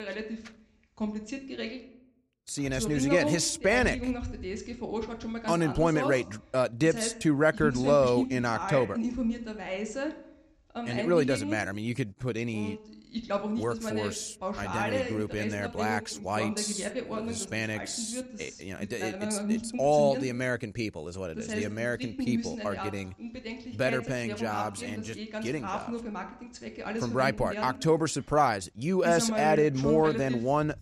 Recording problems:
voice in the background; loud; throughout; 6 dB below the speech

